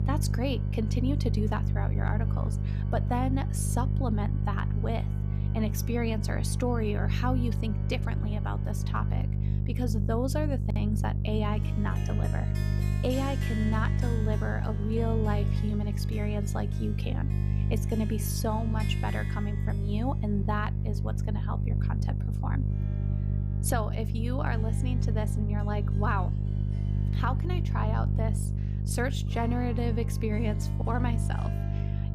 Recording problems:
electrical hum; loud; throughout; 50 Hz, 7 dB below the speech
background music; noticeable; throughout; 15 dB below the speech

